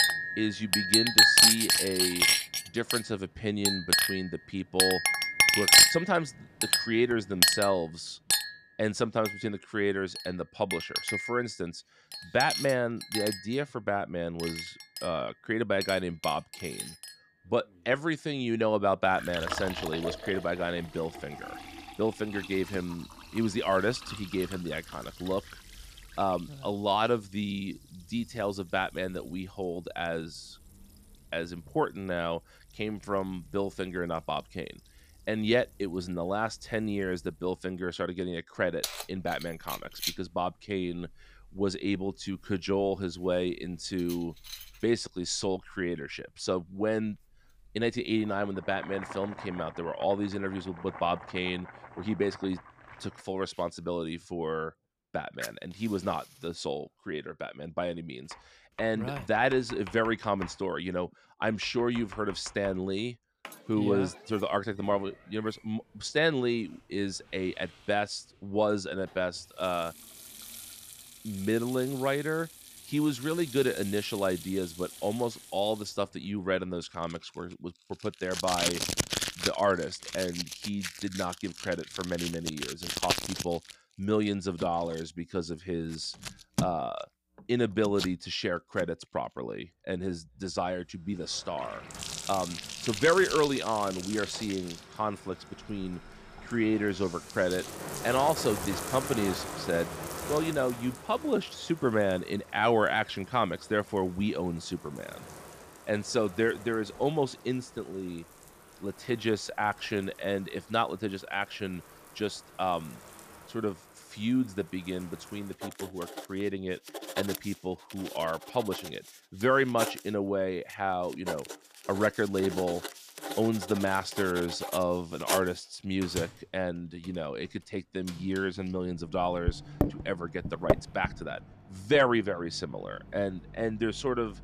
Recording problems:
household noises; very loud; throughout; 2 dB above the speech

